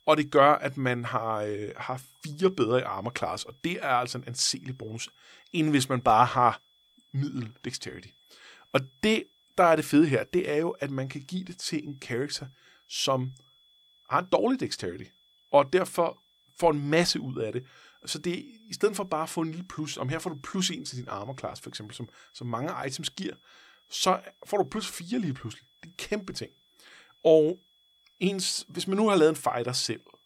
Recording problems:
high-pitched whine; faint; throughout; 3.5 kHz, 35 dB below the speech

